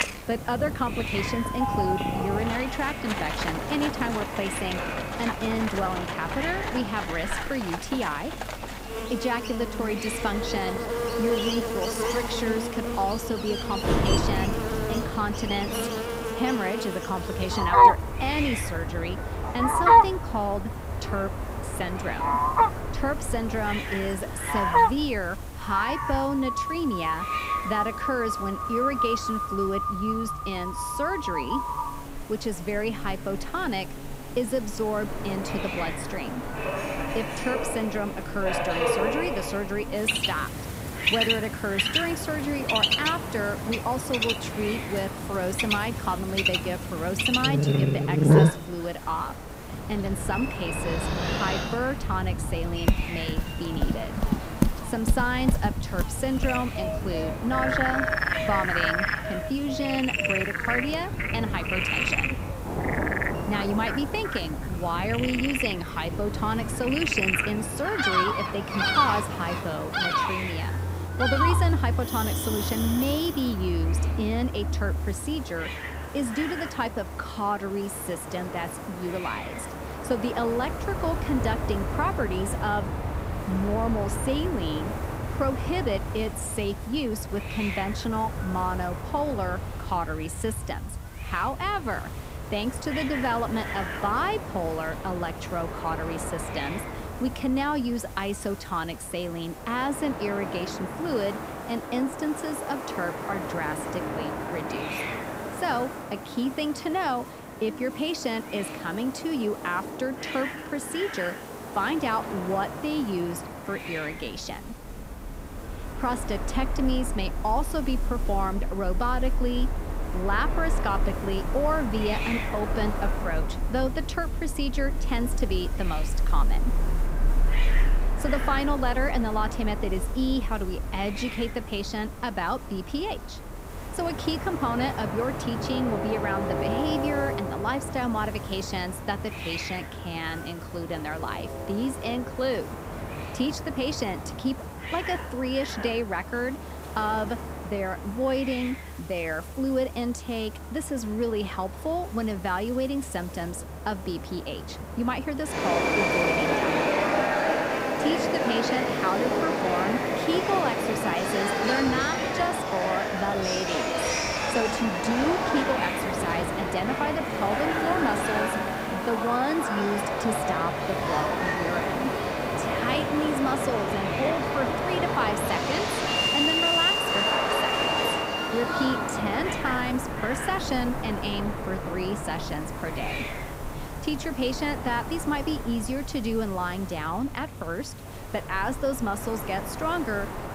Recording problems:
animal sounds; very loud; until 1:13; 3 dB above the speech
train or aircraft noise; loud; throughout; 2 dB below the speech
rain or running water; noticeable; throughout; 15 dB below the speech
hiss; noticeable; throughout; 15 dB below the speech
background chatter; faint; throughout; 2 voices, 30 dB below the speech

